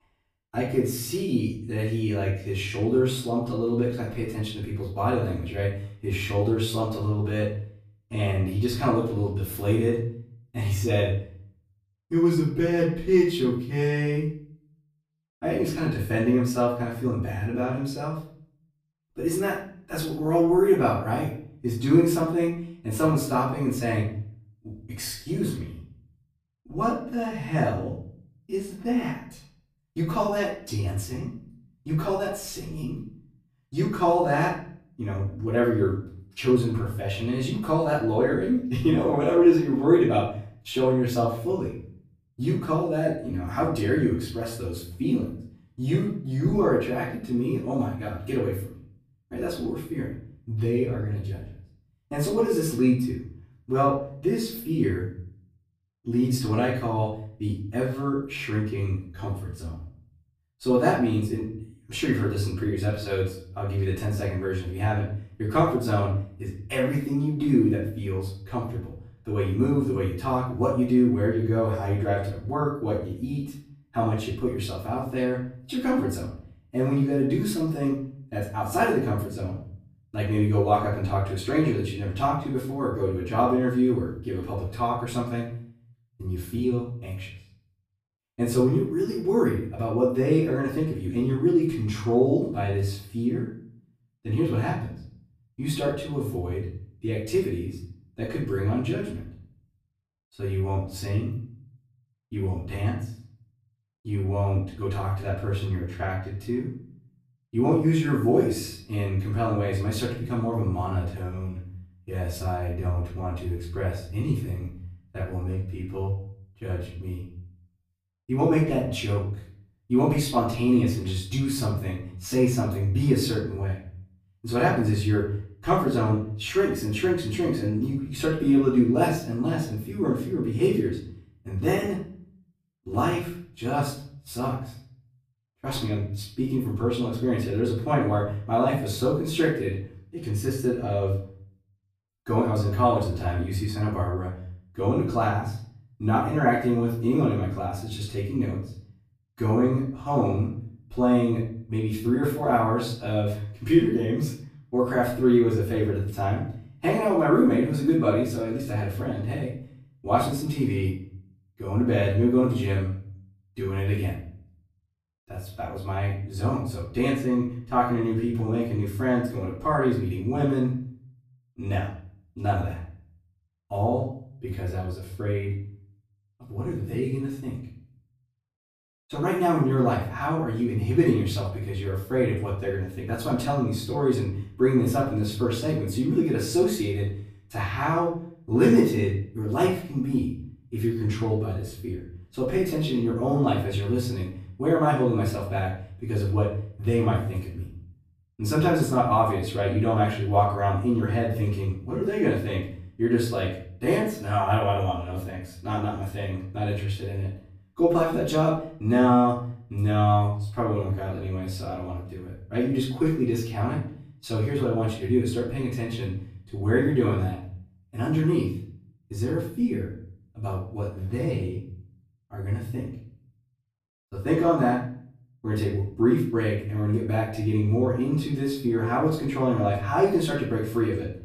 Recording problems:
off-mic speech; far
room echo; noticeable; dies away in 0.5 s

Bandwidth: 15 kHz